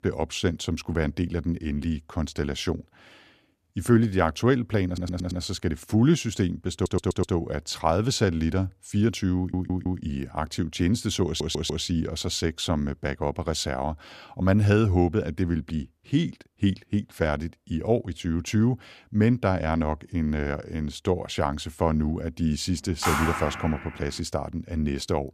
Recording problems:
audio stuttering; 4 times, first at 5 s
phone ringing; loud; at 23 s; peak level with the speech

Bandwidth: 14.5 kHz